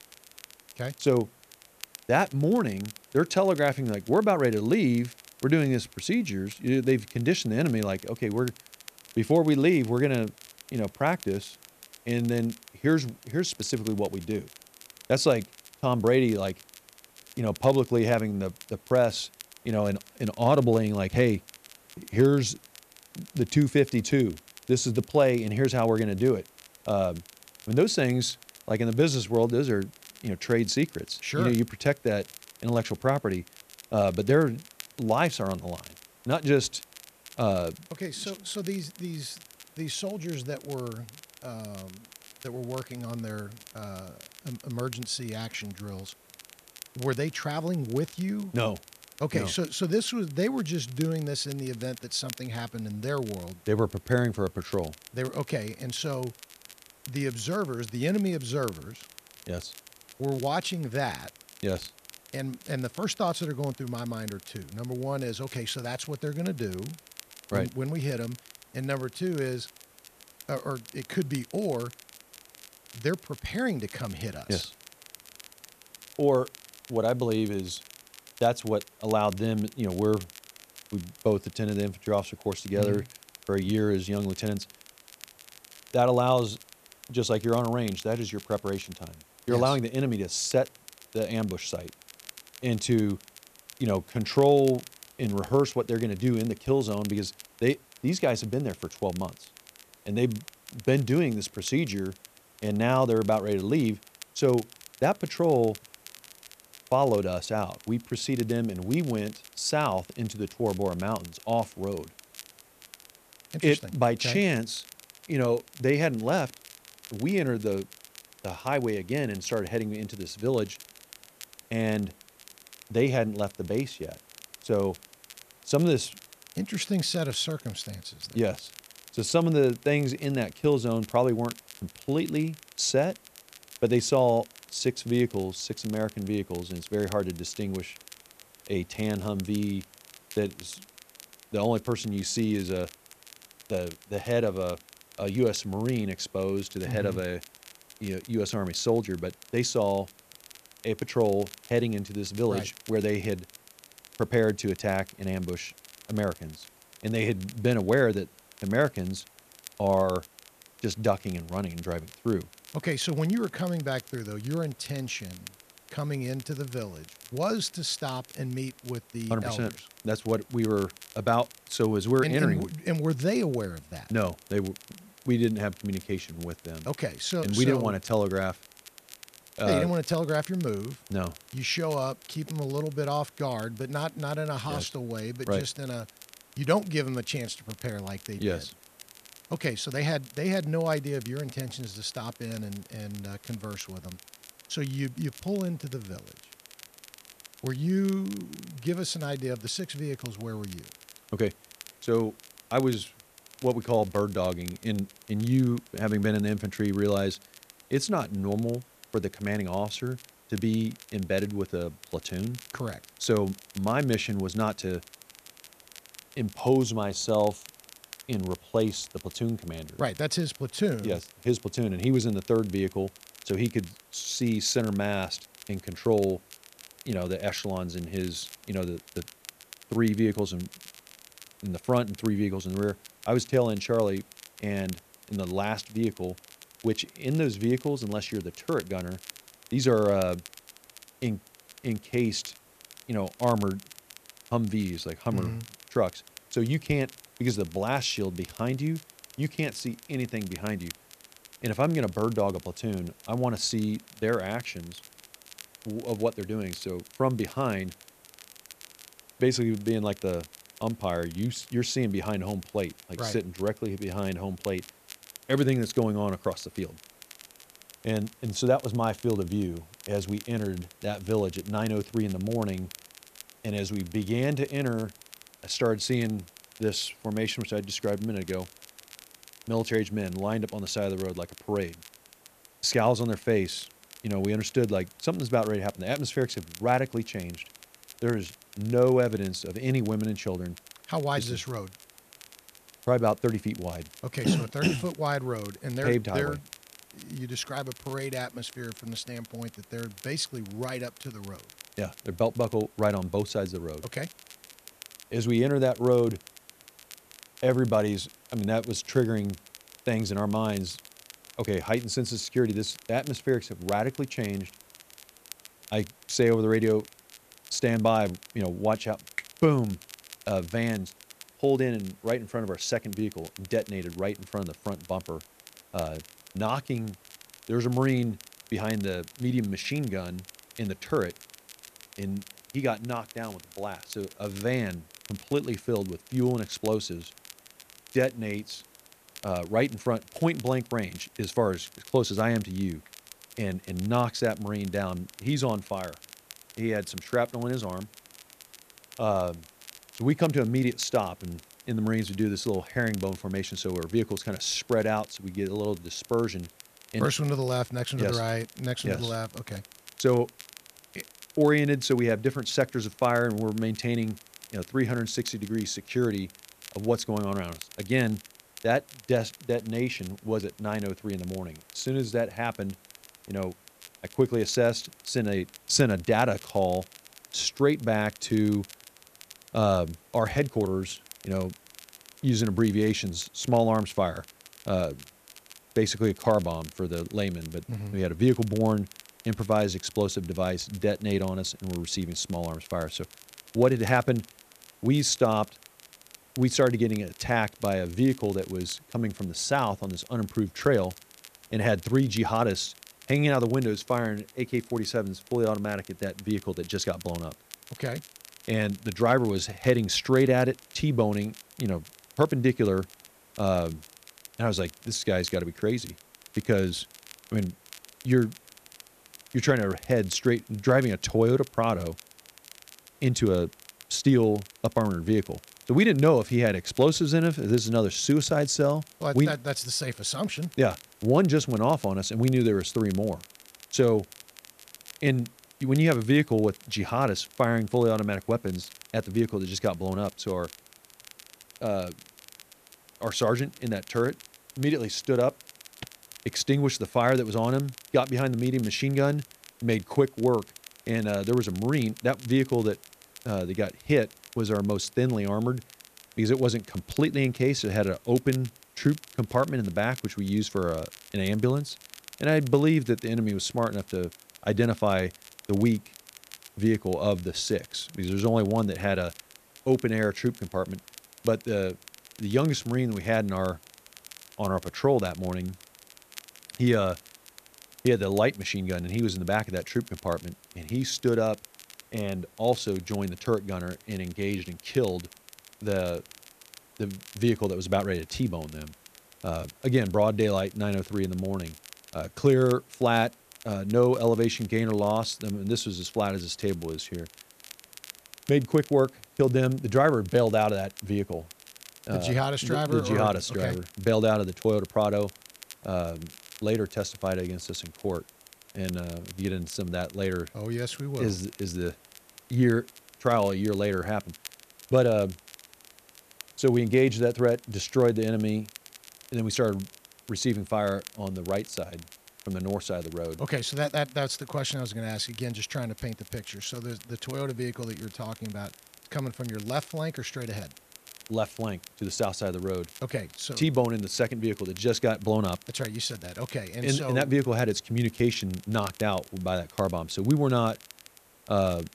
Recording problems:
hiss; faint; throughout; 30 dB below the speech
crackle, like an old record; faint; 20 dB below the speech

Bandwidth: 14.5 kHz